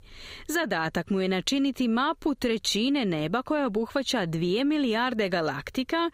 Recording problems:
squashed, flat; somewhat

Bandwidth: 15.5 kHz